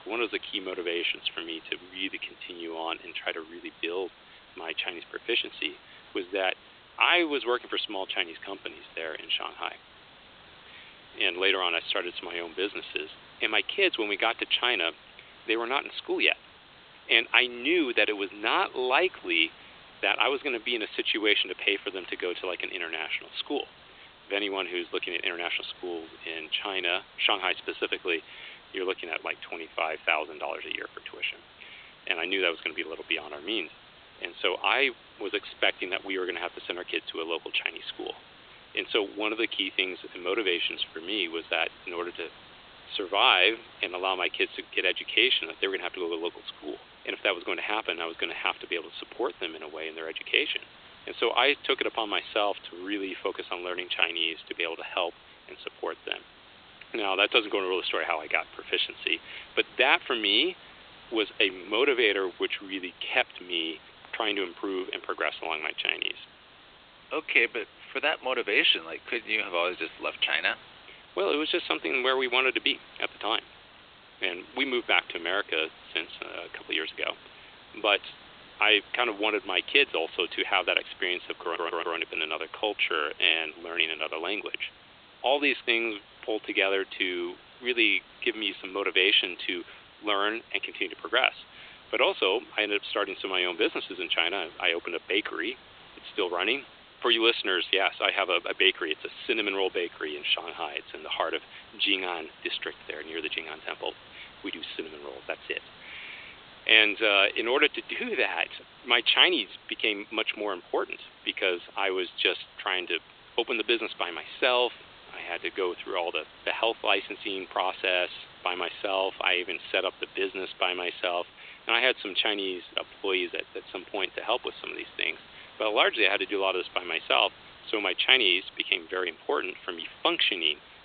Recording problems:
thin; very; fading below 300 Hz
high frequencies cut off; severe; nothing above 4 kHz
hiss; faint; throughout; 25 dB below the speech
audio stuttering; at 1:21

